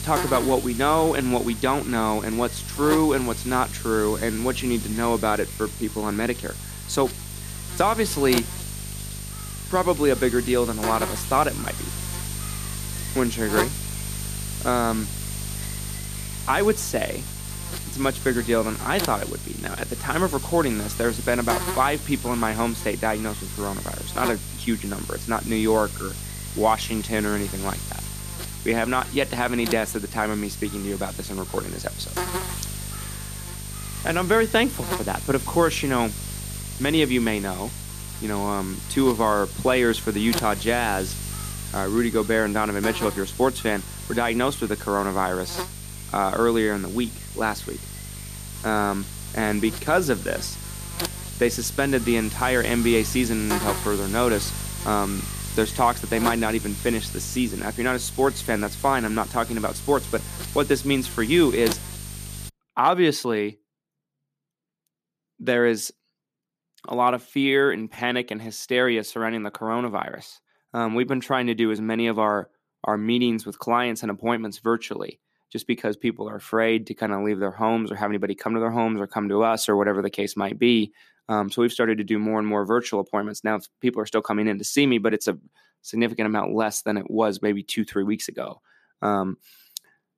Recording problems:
electrical hum; noticeable; until 1:02; 50 Hz, 10 dB below the speech

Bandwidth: 14.5 kHz